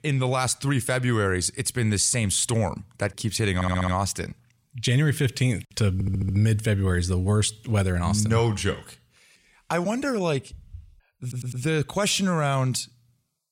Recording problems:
audio stuttering; at 3.5 s, at 6 s and at 11 s

